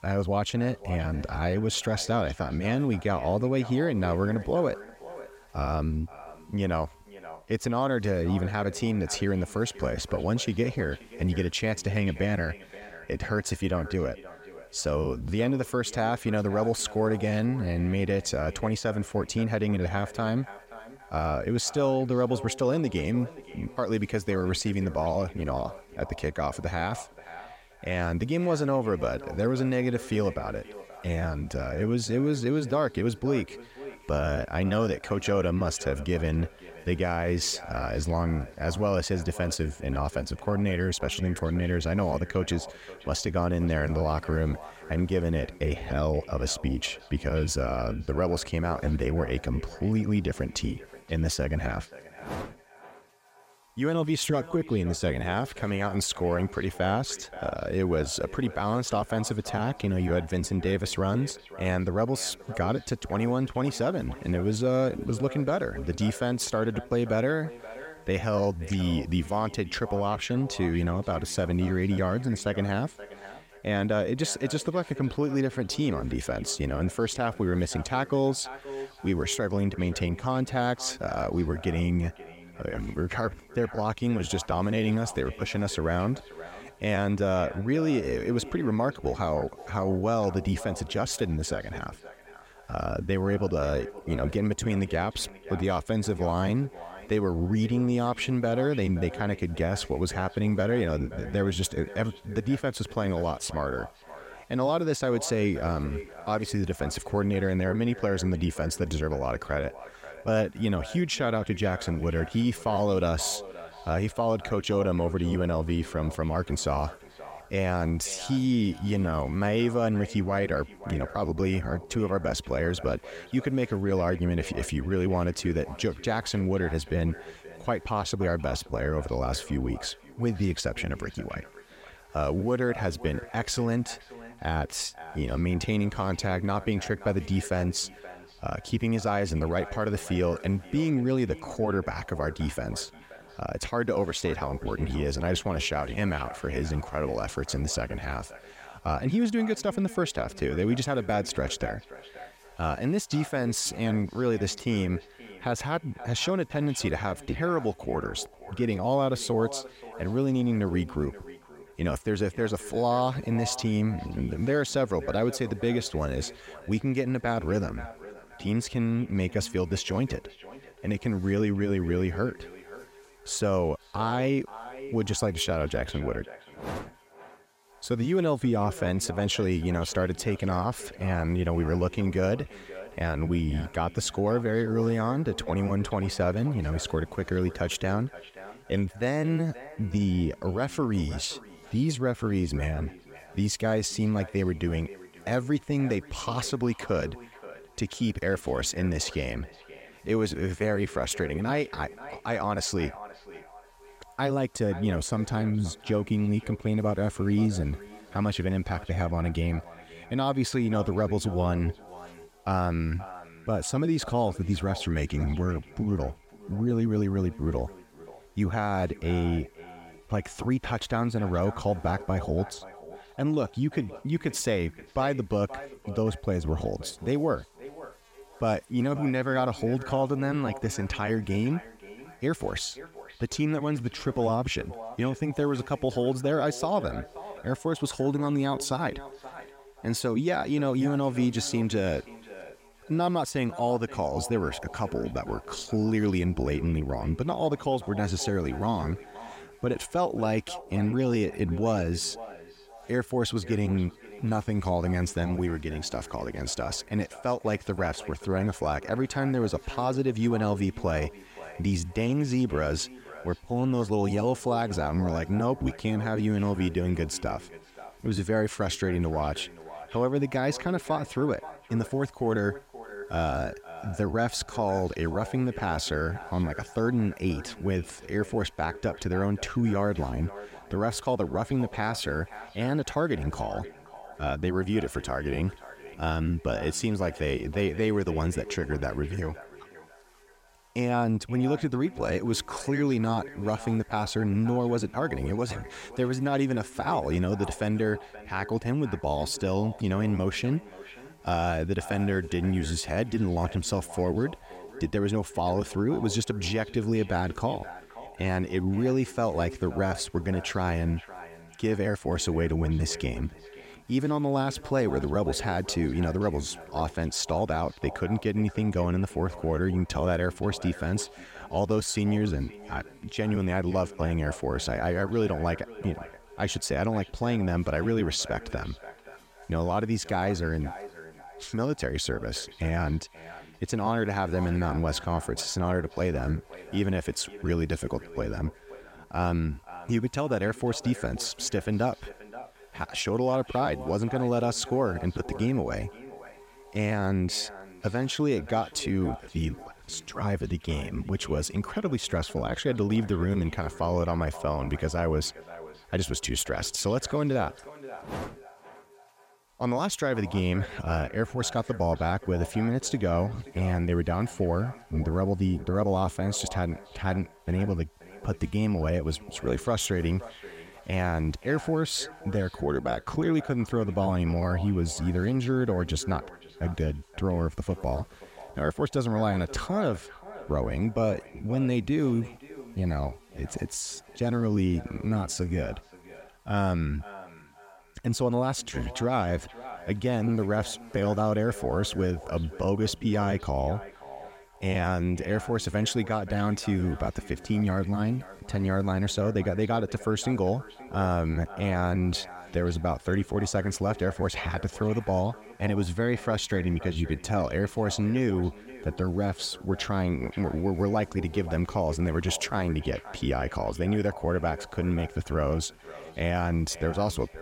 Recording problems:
echo of what is said; noticeable; throughout; 530 ms later, 15 dB below the speech
electrical hum; faint; throughout; 60 Hz, 30 dB below the speech

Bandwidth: 16 kHz